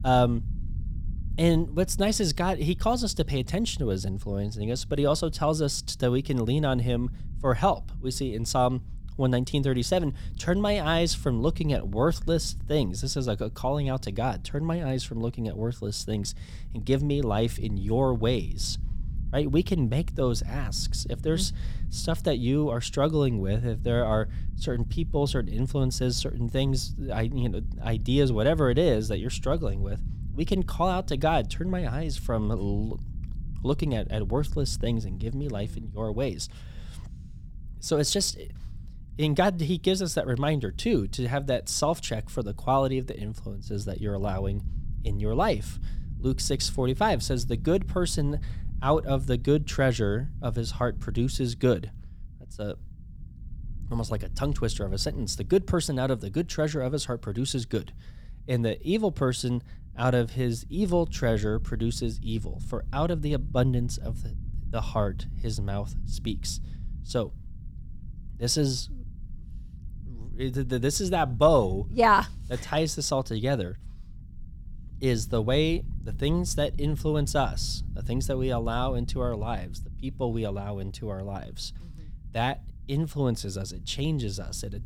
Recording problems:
low rumble; faint; throughout; 25 dB below the speech

